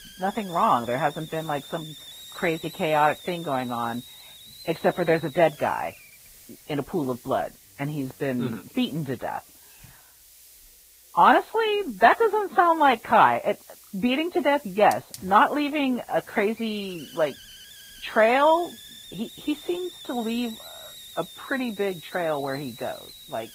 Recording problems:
garbled, watery; badly; nothing above 4 kHz
hiss; noticeable; throughout; 20 dB below the speech

